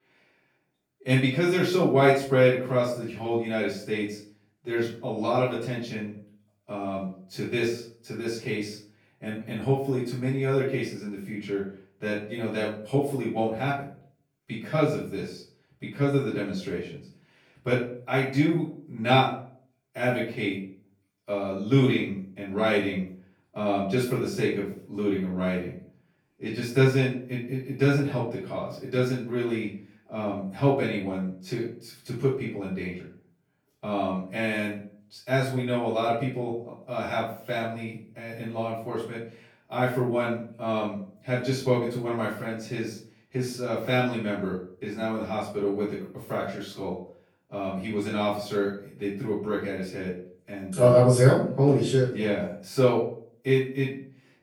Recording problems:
off-mic speech; far
room echo; noticeable; dies away in 0.4 s

